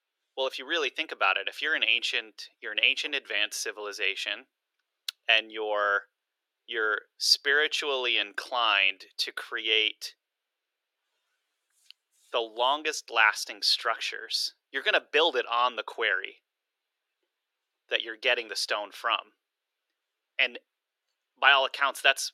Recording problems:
thin; very; fading below 350 Hz

